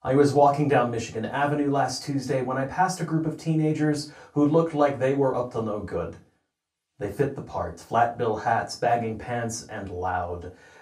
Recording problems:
off-mic speech; far
room echo; very slight; dies away in 0.2 s

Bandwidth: 15 kHz